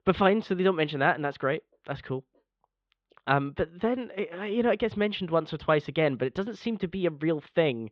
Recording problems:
muffled; very; fading above 3.5 kHz

